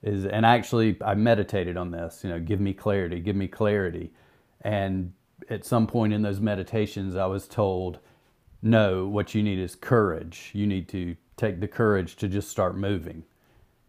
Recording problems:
none

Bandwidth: 15 kHz